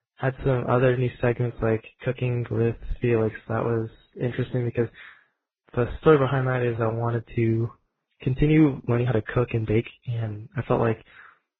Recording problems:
garbled, watery; badly; nothing above 16 kHz
uneven, jittery; strongly; from 2 to 11 s

